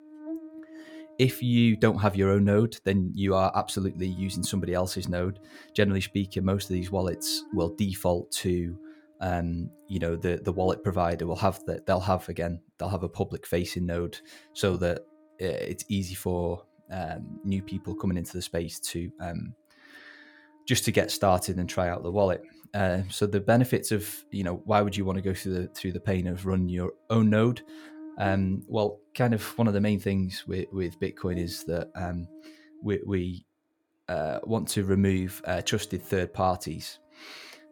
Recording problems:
electrical hum; faint; throughout; 50 Hz, 20 dB below the speech

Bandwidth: 17.5 kHz